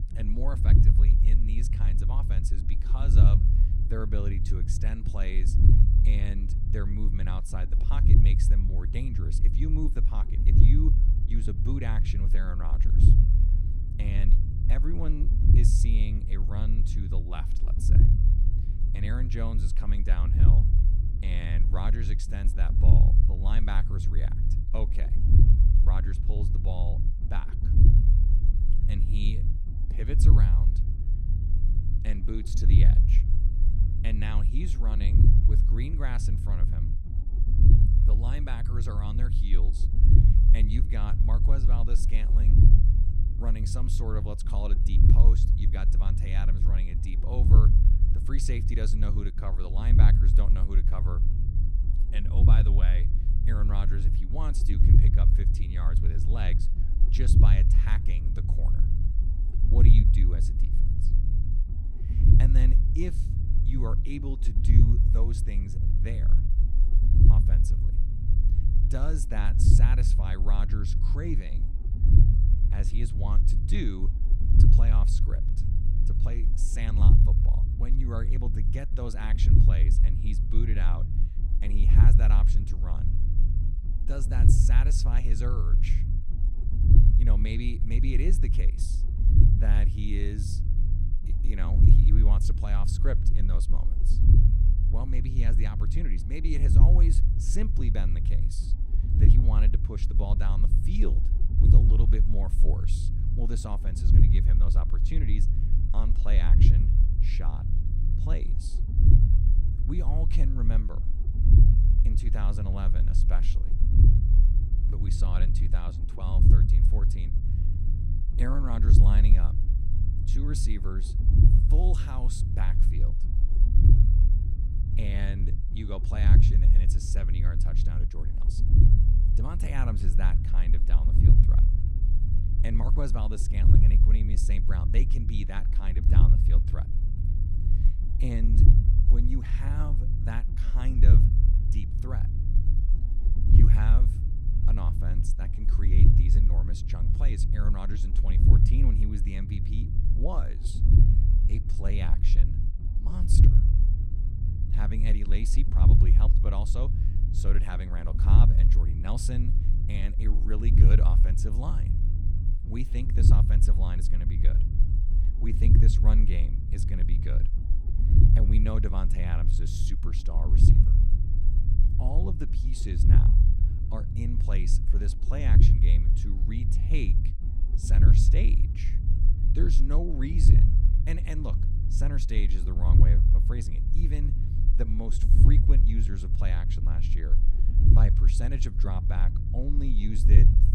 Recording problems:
low rumble; loud; throughout; as loud as the speech

